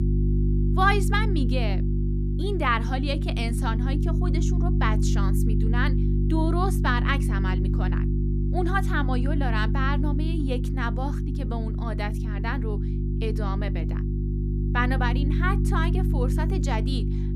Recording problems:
electrical hum; loud; throughout; 50 Hz, 7 dB below the speech

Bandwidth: 14.5 kHz